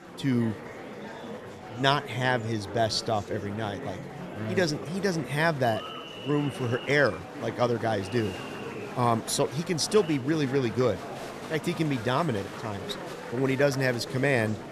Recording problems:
murmuring crowd; noticeable; throughout; 10 dB below the speech

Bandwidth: 14 kHz